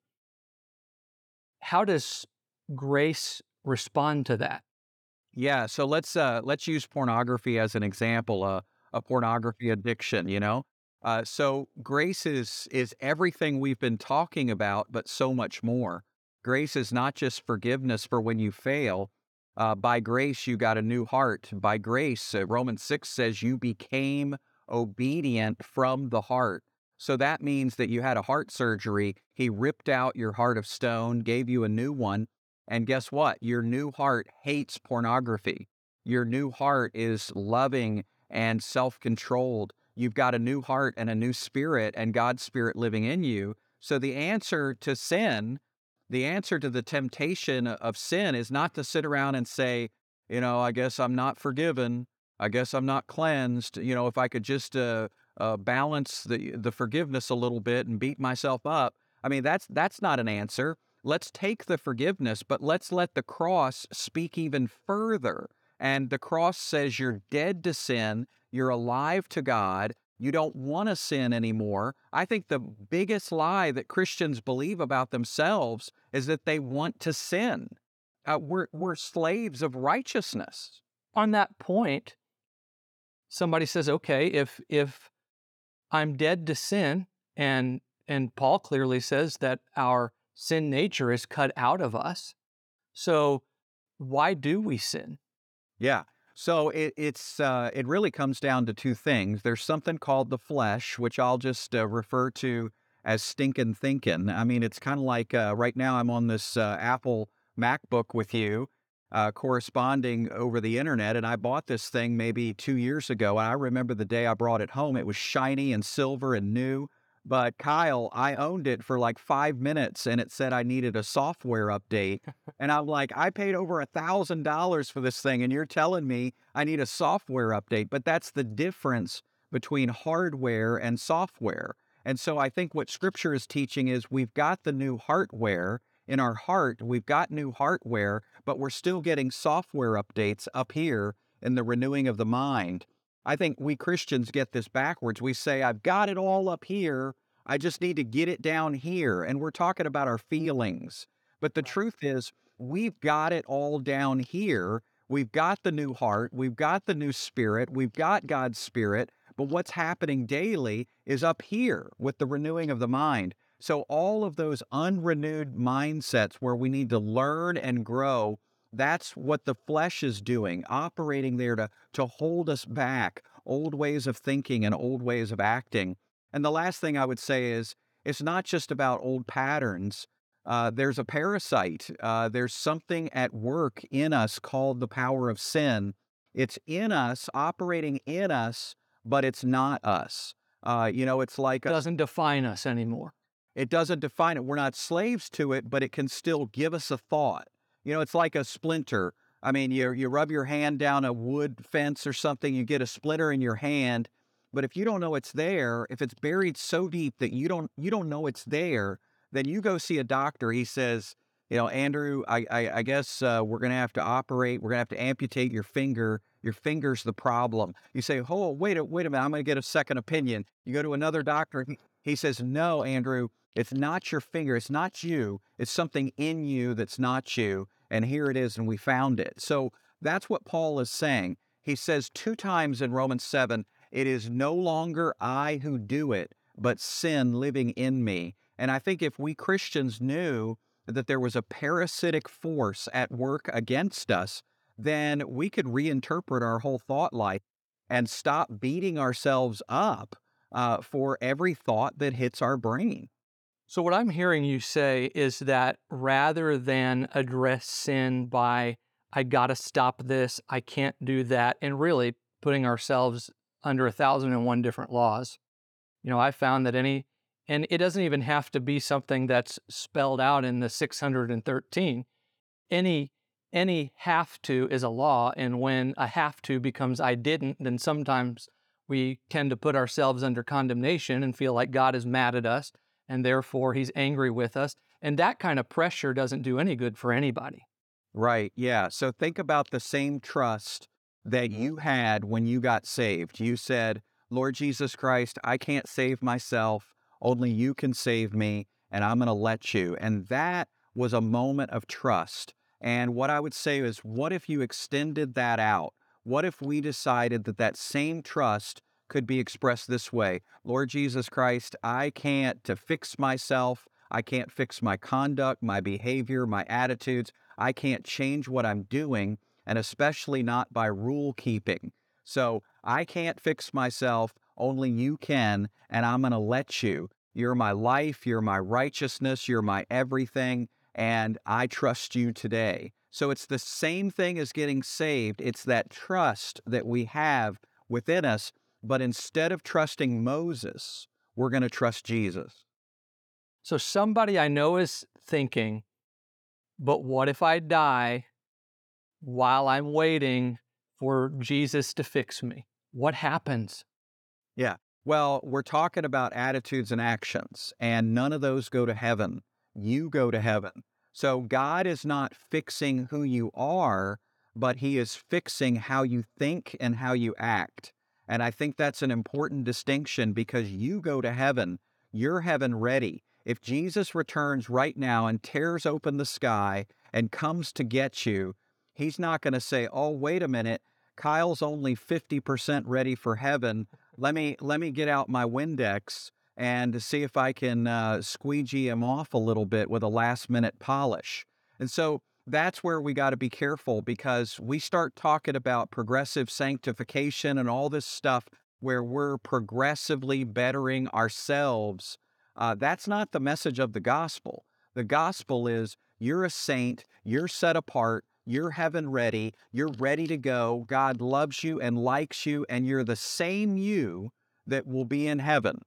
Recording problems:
none

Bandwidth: 18.5 kHz